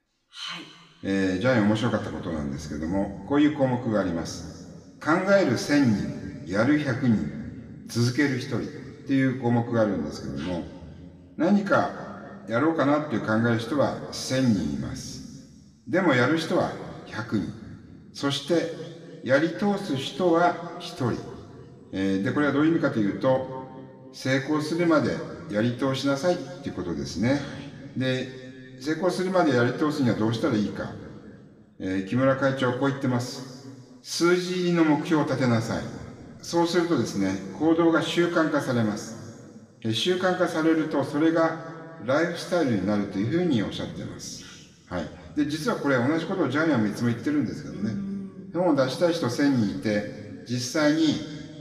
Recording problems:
room echo; slight; dies away in 2 s
off-mic speech; somewhat distant

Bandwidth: 15 kHz